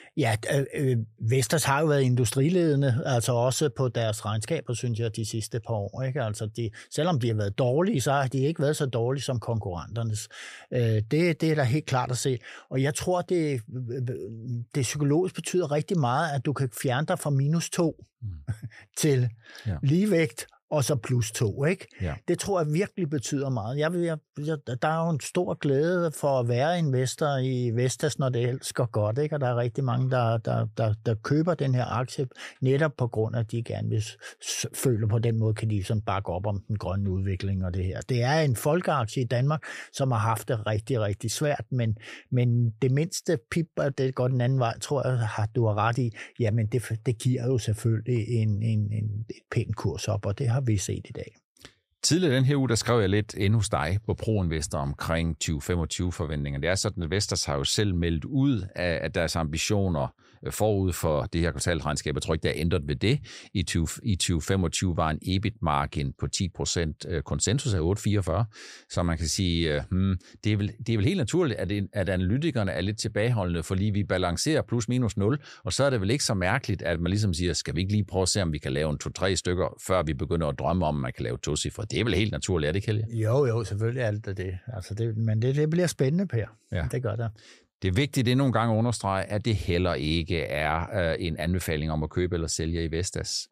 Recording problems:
none

